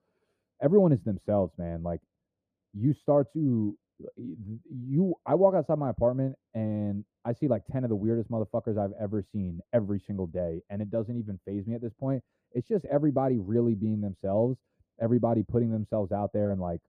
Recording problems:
muffled; very; fading above 1 kHz

